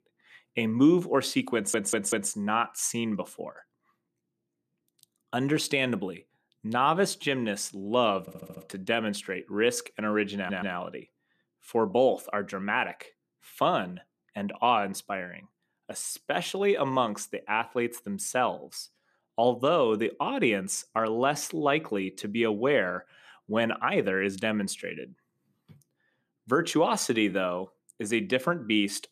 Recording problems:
audio stuttering; at 1.5 s, at 8 s and at 10 s

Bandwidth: 14.5 kHz